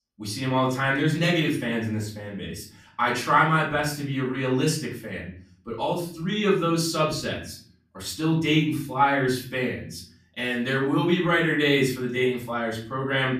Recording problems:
off-mic speech; far
room echo; slight; dies away in 0.5 s

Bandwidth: 15 kHz